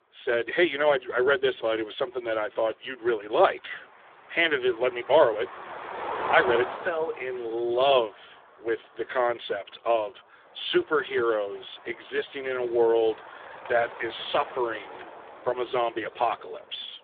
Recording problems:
phone-call audio; poor line; nothing above 3.5 kHz
traffic noise; noticeable; throughout; 10 dB below the speech

